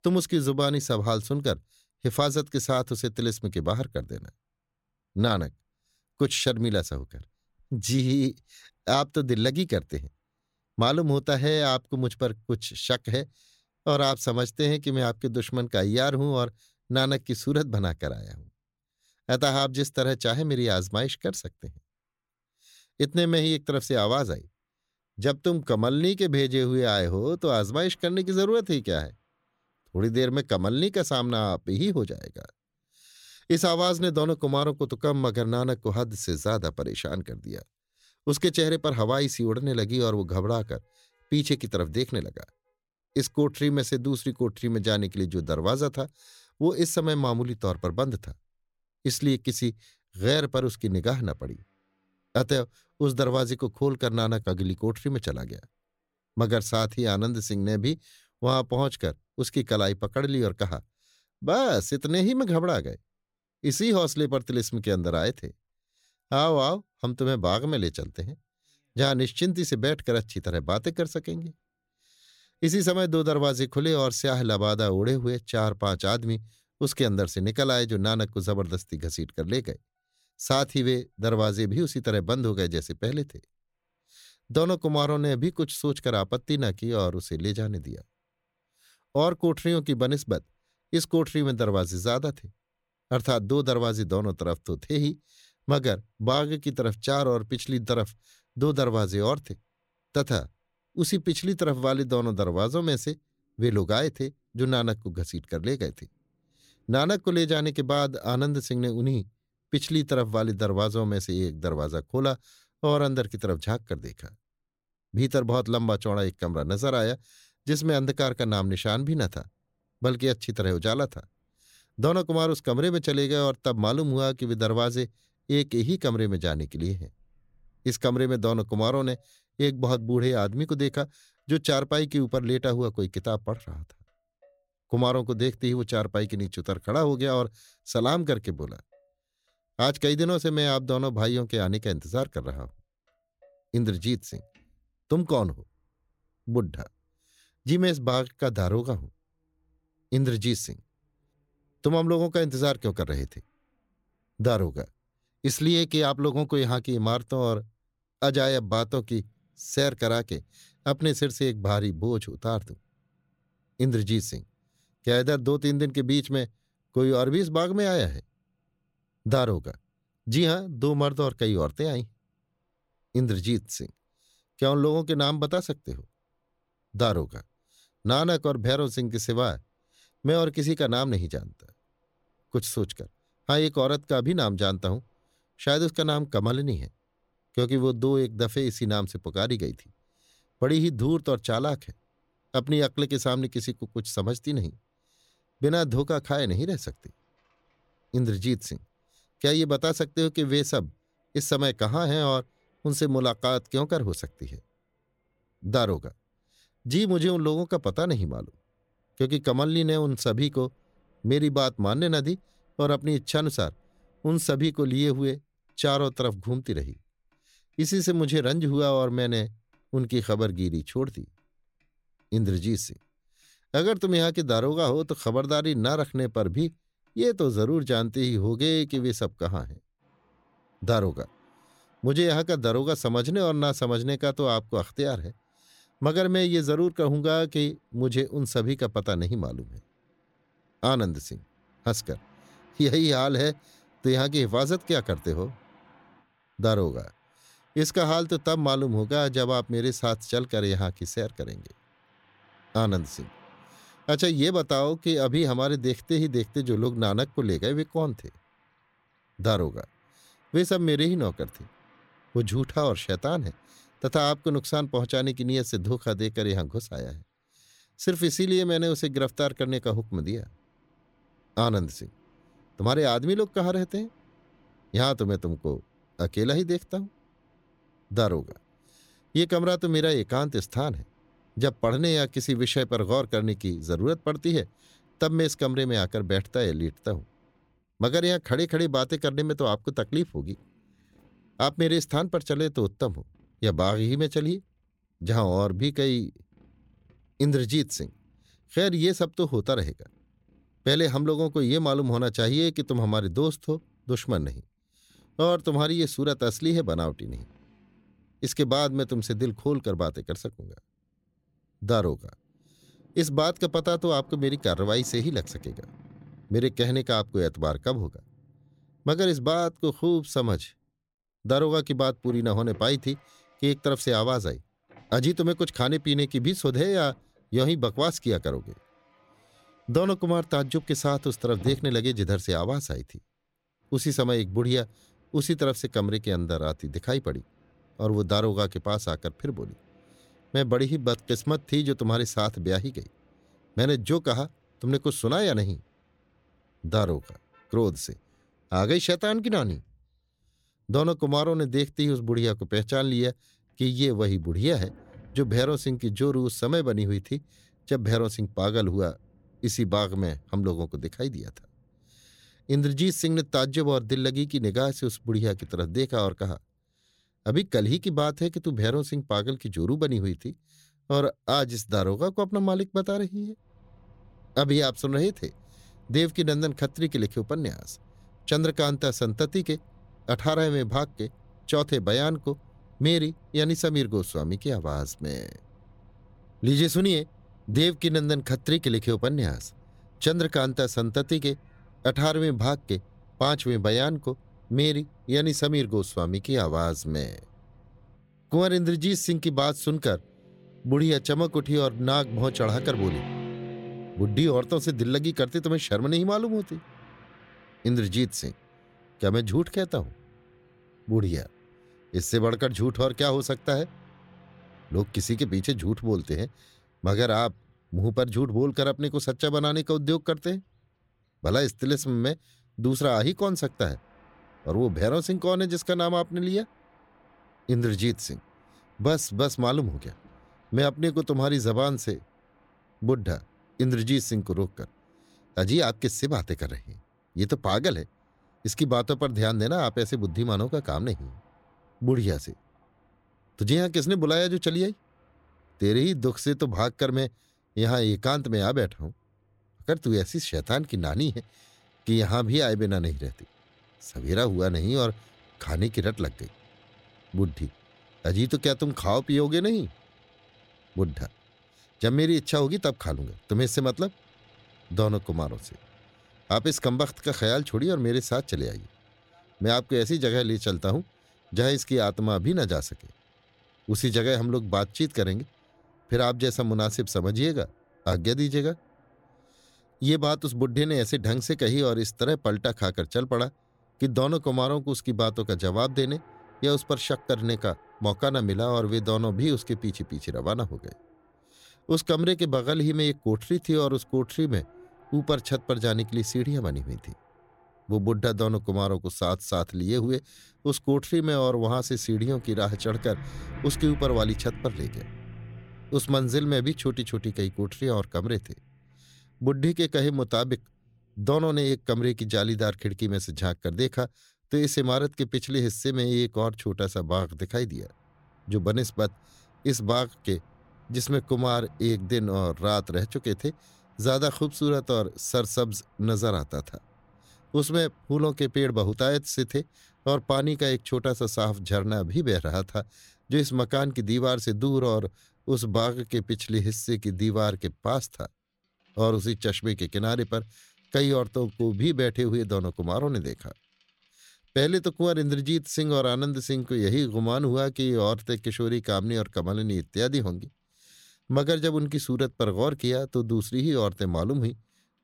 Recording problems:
traffic noise; faint; throughout; 25 dB below the speech

